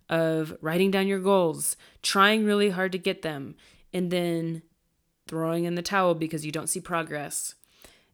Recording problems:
none

